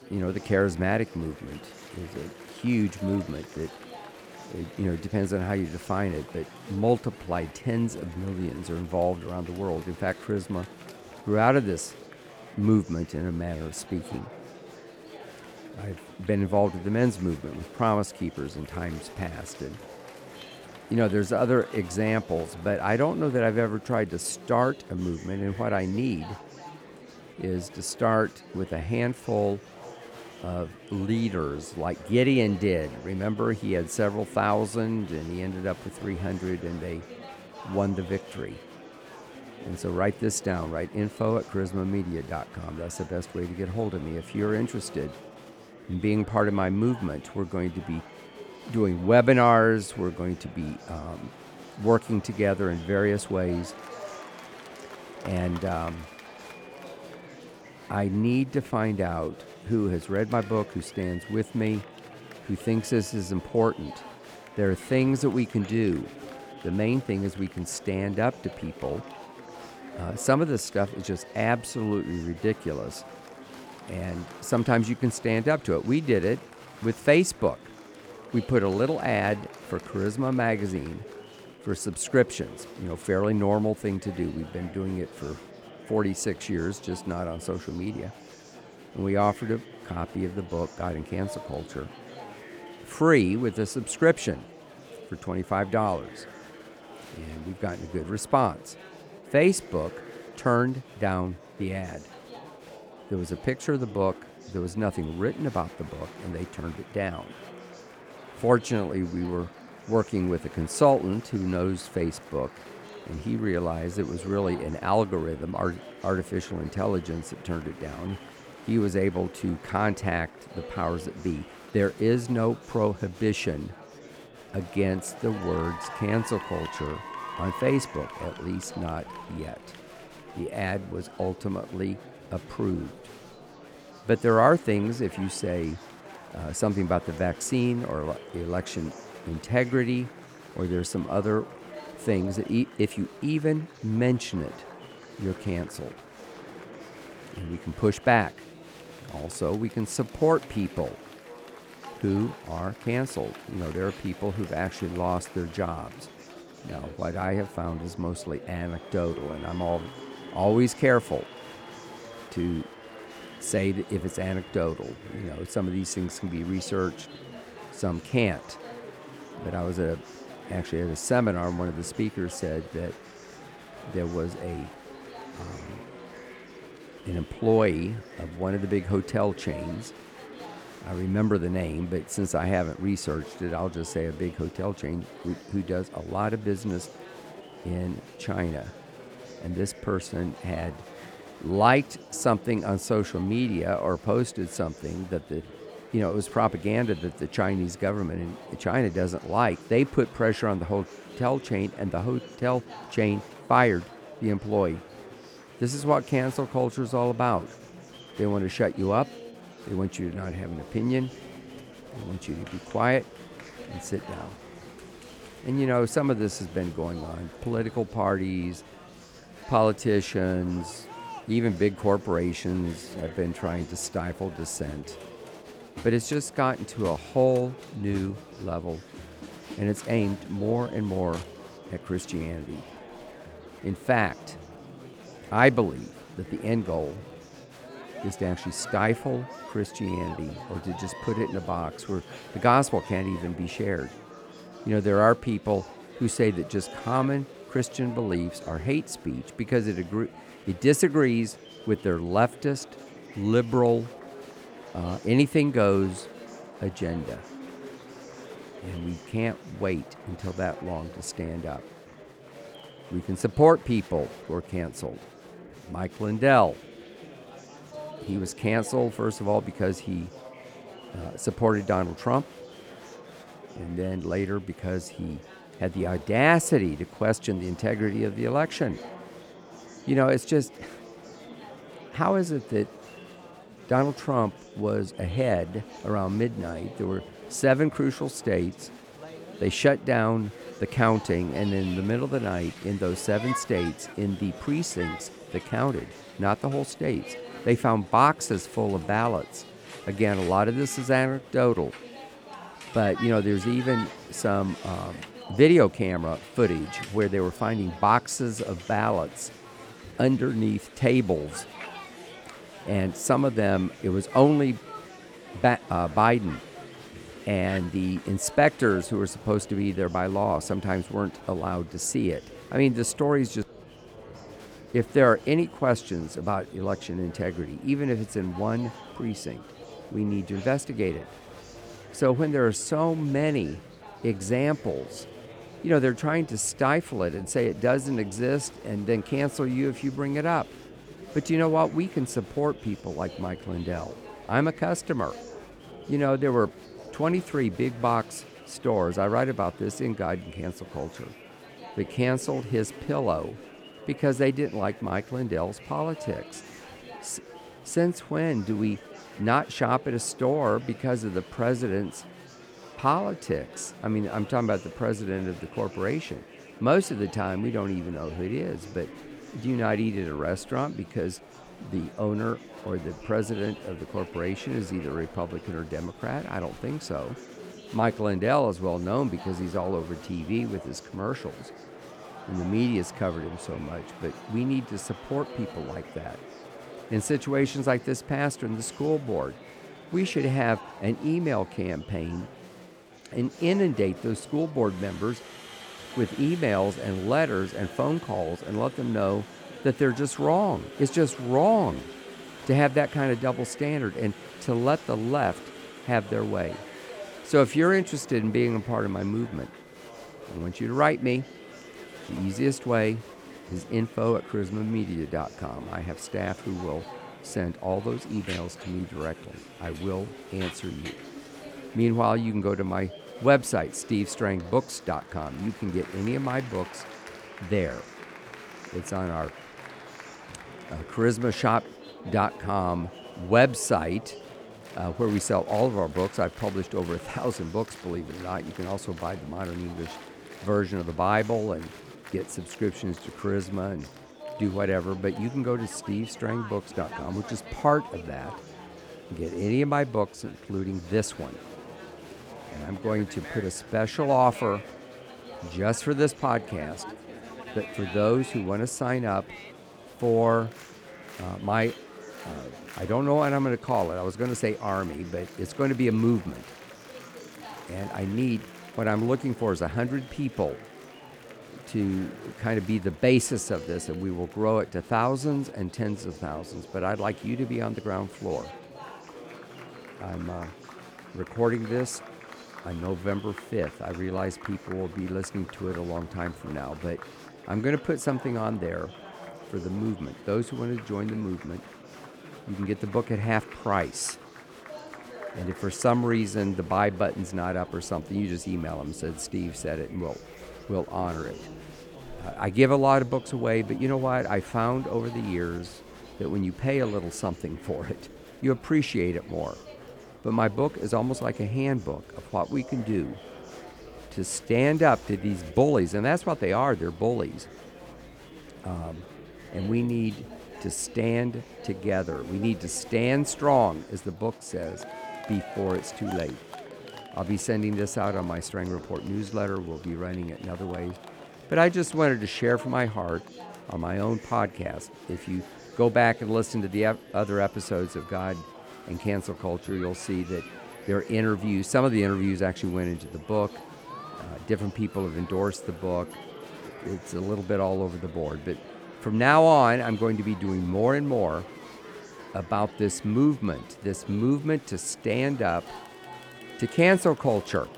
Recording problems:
murmuring crowd; noticeable; throughout; 15 dB below the speech

